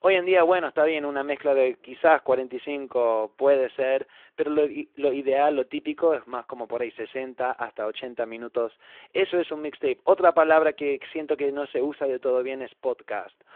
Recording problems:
phone-call audio

